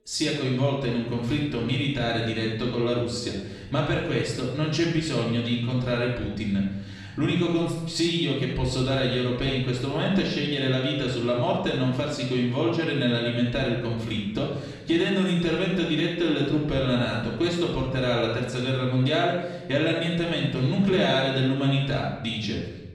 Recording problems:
off-mic speech; far
room echo; noticeable; dies away in 0.9 s

